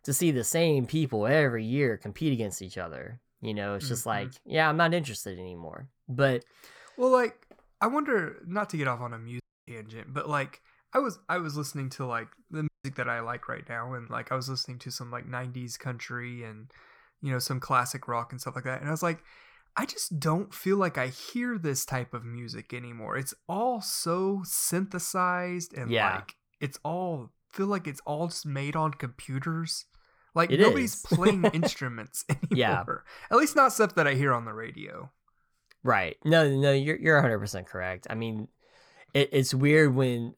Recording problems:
audio cutting out; at 9.5 s and at 13 s

